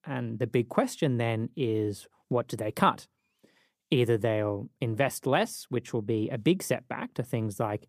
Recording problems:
none

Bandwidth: 15 kHz